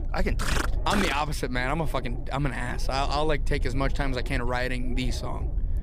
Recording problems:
low rumble; noticeable; throughout; 20 dB below the speech

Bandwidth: 15.5 kHz